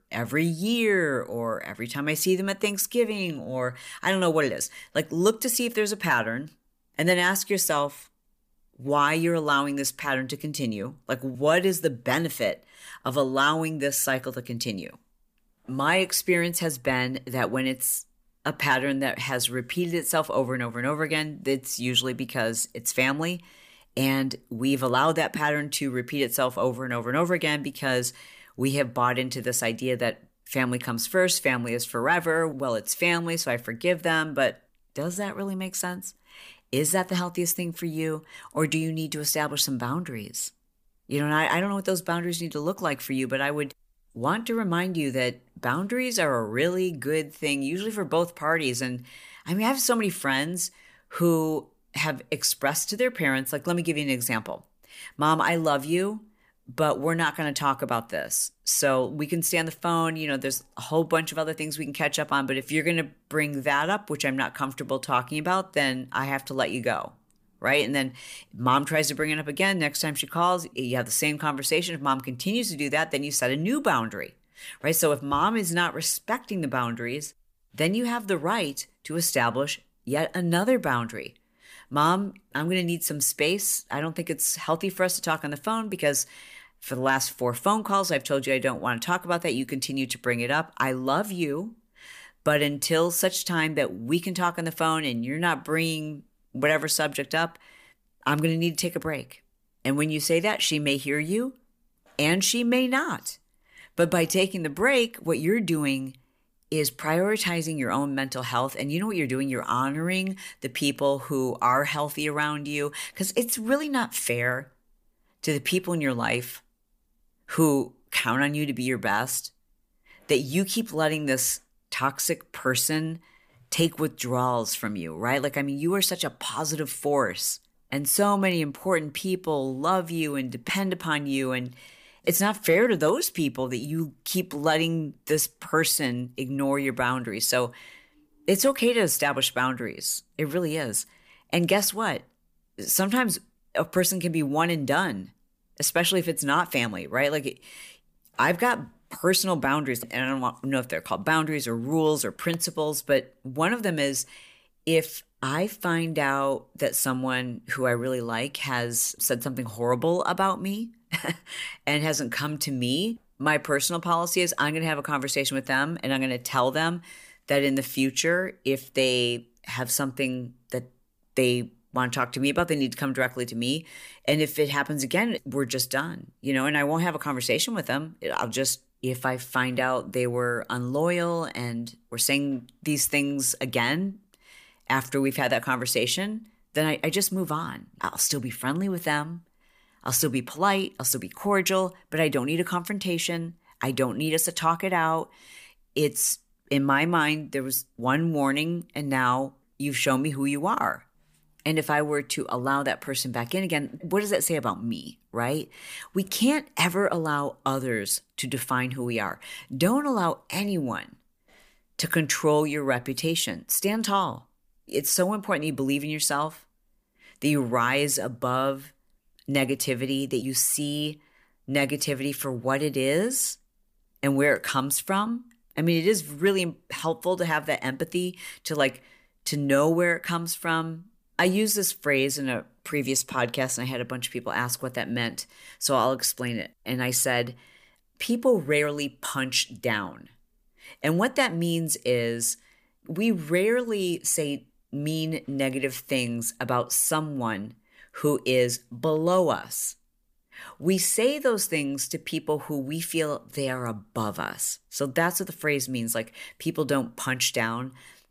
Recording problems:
none

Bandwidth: 15 kHz